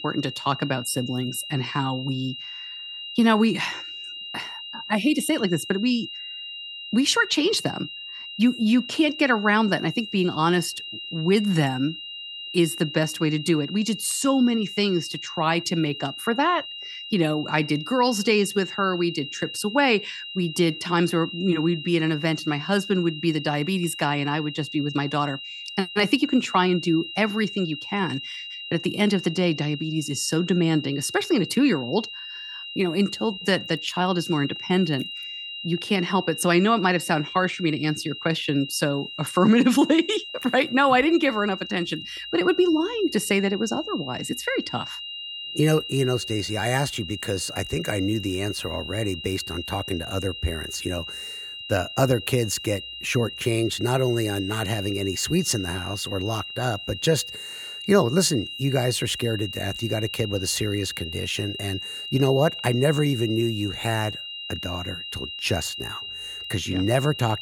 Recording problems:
high-pitched whine; loud; throughout; 3 kHz, 9 dB below the speech

